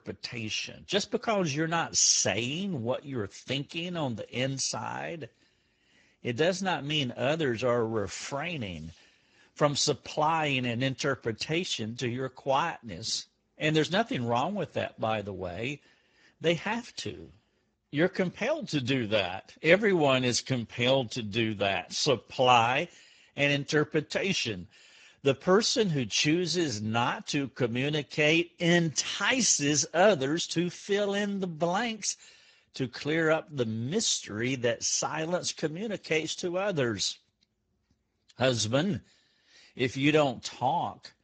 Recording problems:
garbled, watery; badly; nothing above 7.5 kHz

